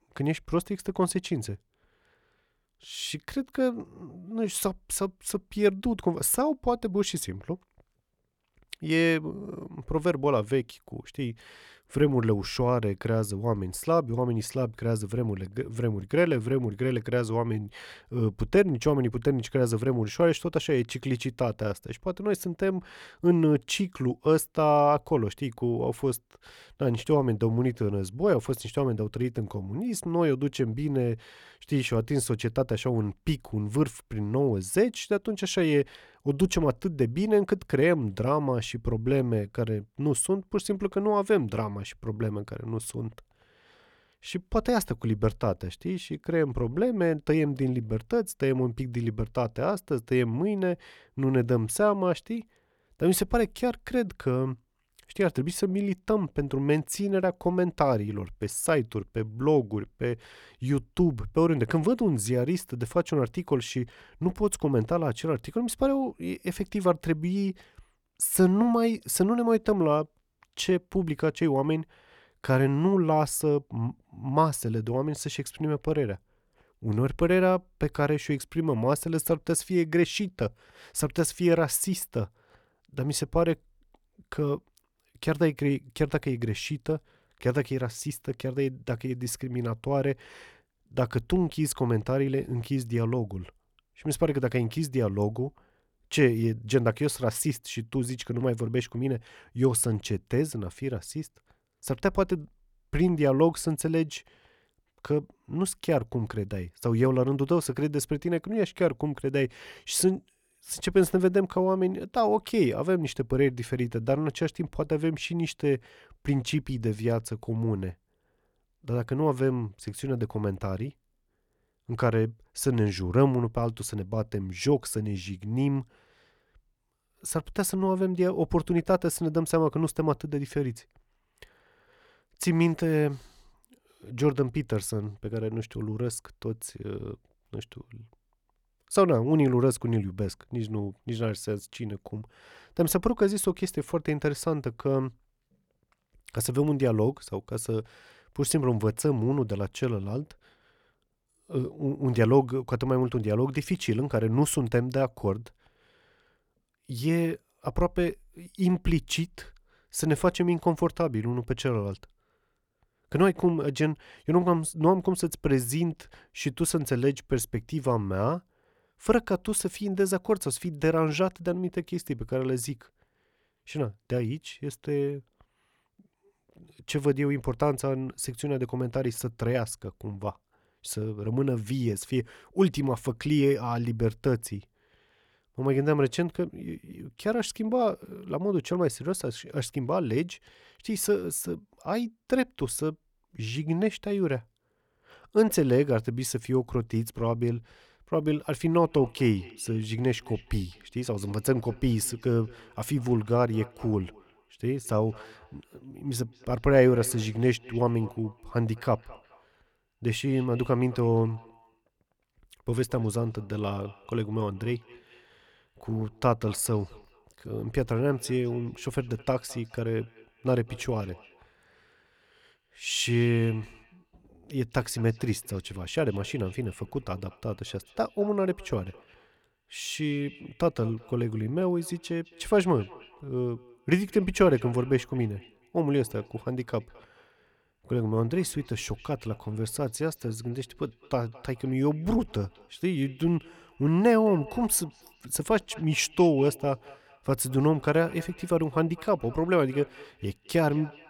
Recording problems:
echo of what is said; faint; from 3:19 on; 210 ms later, 25 dB below the speech

